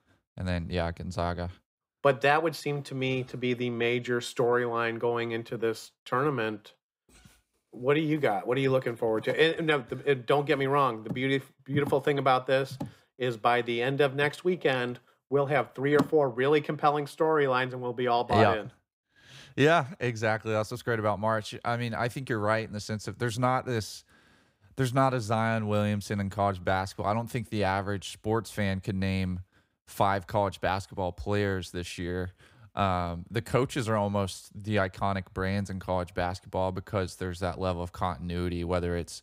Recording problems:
none

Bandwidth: 15.5 kHz